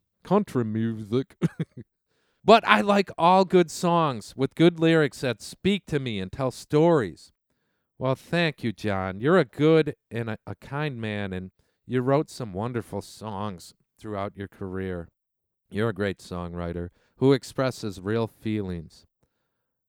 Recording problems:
none

